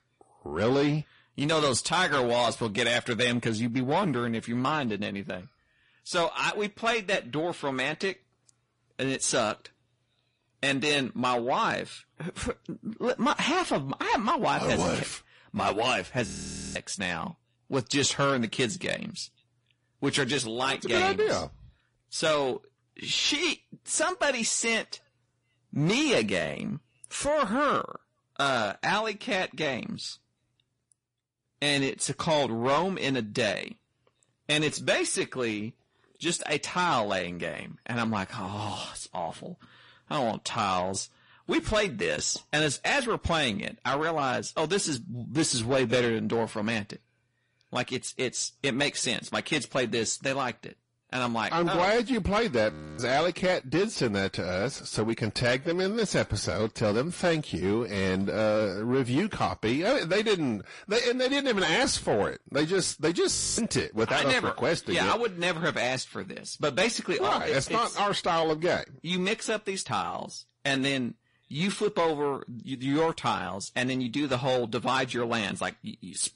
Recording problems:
distortion; slight; 10 dB below the speech
garbled, watery; slightly; nothing above 10.5 kHz
audio freezing; at 16 s, at 53 s and at 1:03

